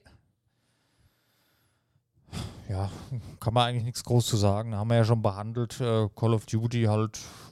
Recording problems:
none

